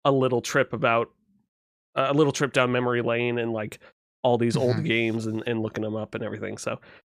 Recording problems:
none

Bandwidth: 15 kHz